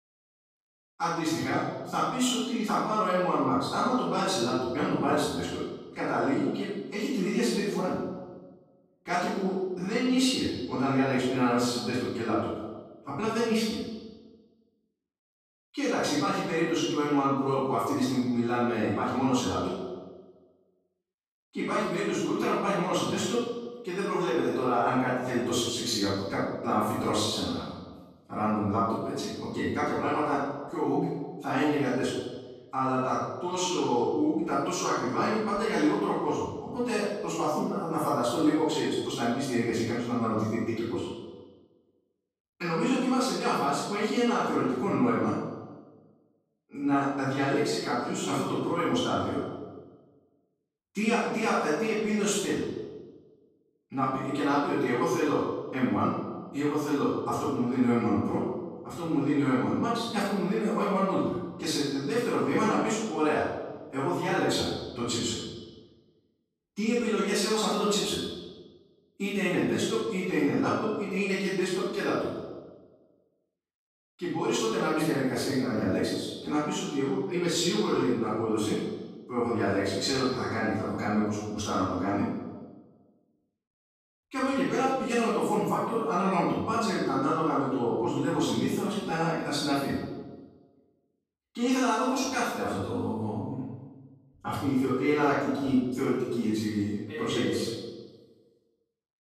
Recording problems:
room echo; strong; dies away in 1.2 s
off-mic speech; far

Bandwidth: 14.5 kHz